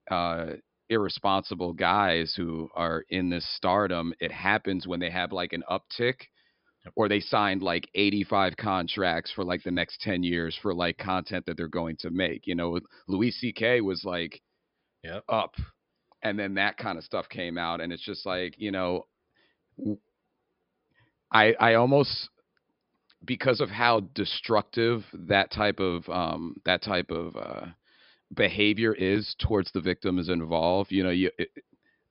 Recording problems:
high frequencies cut off; noticeable; nothing above 5.5 kHz

